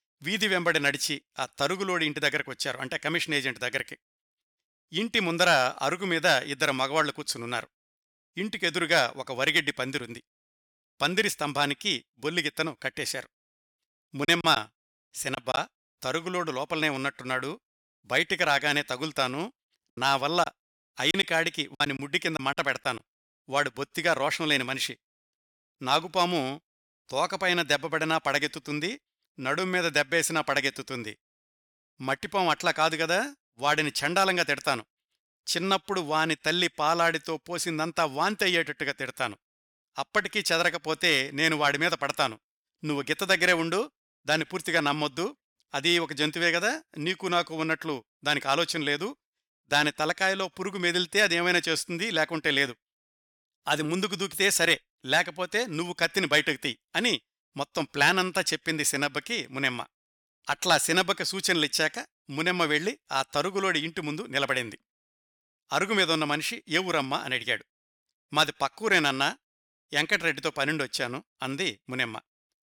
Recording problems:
choppy; very; from 14 to 16 s and from 20 to 23 s; 11% of the speech affected

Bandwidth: 18.5 kHz